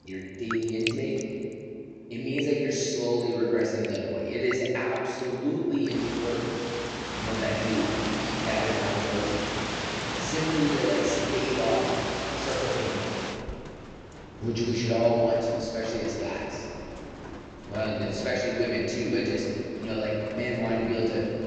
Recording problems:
room echo; strong; dies away in 2.4 s
off-mic speech; far
high frequencies cut off; noticeable; nothing above 8 kHz
rain or running water; loud; throughout; 5 dB below the speech

